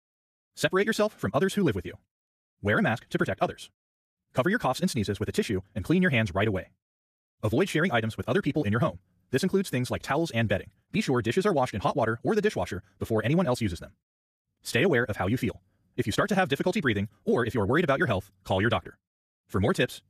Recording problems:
wrong speed, natural pitch; too fast; 1.8 times normal speed

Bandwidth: 14.5 kHz